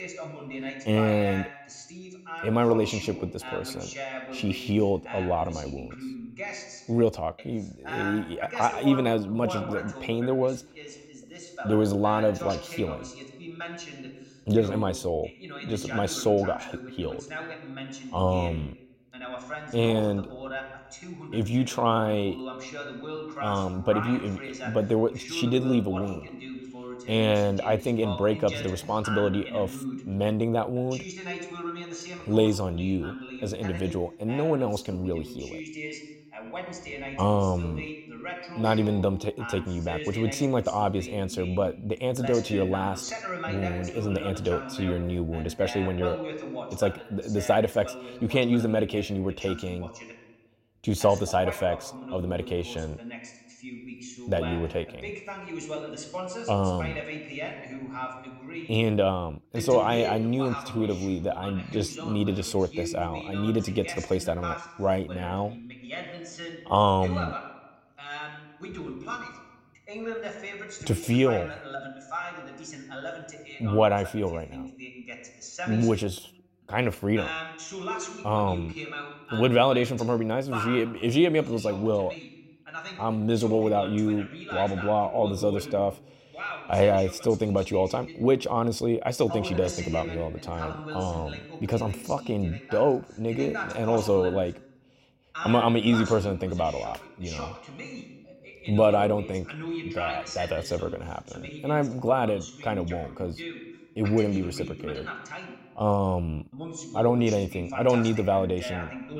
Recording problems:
voice in the background; noticeable; throughout; 10 dB below the speech

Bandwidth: 16 kHz